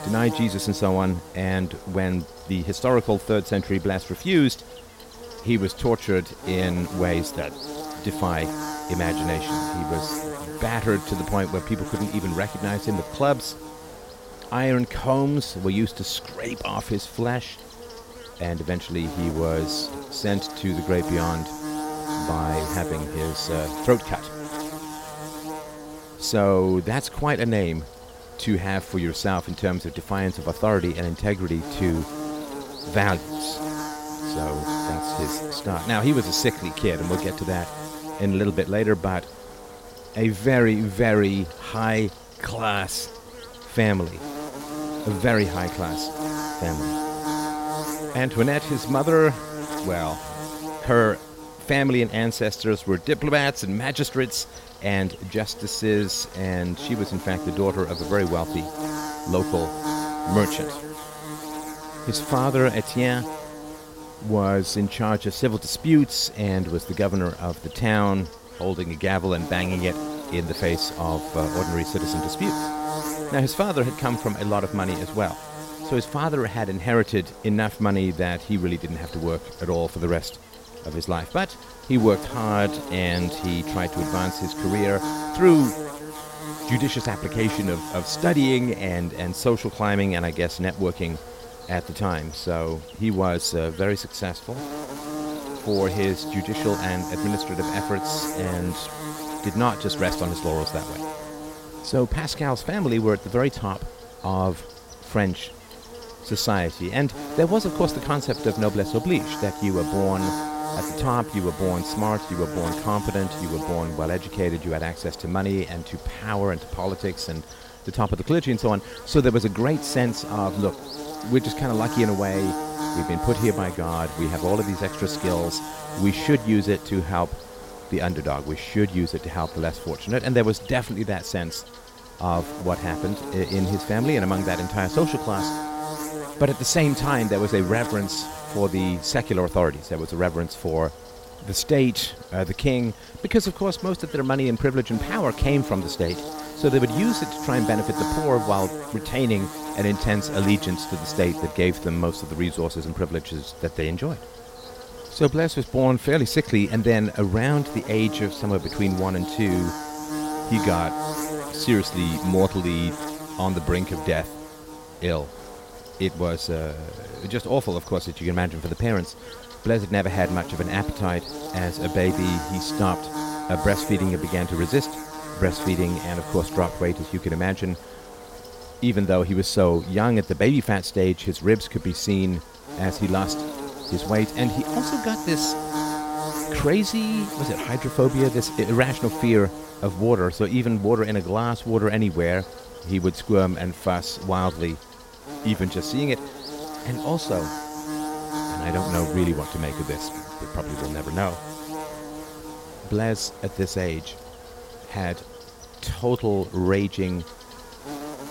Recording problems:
electrical hum; loud; throughout; 50 Hz, 8 dB below the speech

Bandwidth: 16 kHz